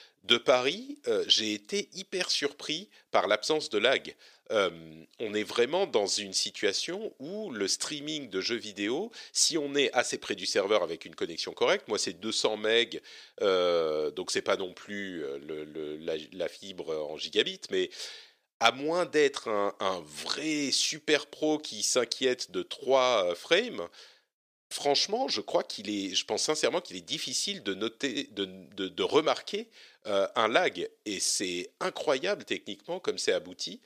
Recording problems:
thin; somewhat; fading below 400 Hz

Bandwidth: 15 kHz